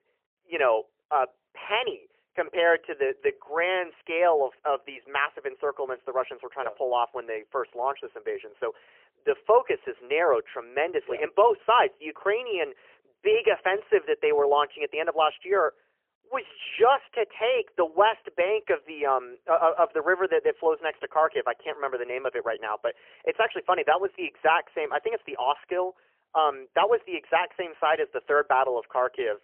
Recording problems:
phone-call audio; poor line; nothing above 3 kHz

